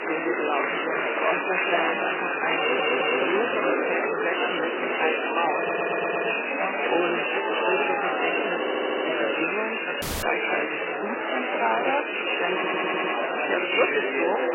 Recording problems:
garbled, watery; badly; nothing above 3 kHz
thin; very; fading below 350 Hz
murmuring crowd; very loud; throughout; 5 dB above the speech
audio stuttering; 4 times, first at 2.5 s
audio cutting out; at 10 s

